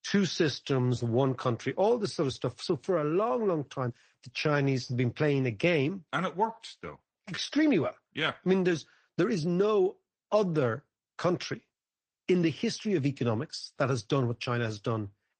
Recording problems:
garbled, watery; slightly; nothing above 8 kHz
uneven, jittery; strongly; from 0.5 to 15 s

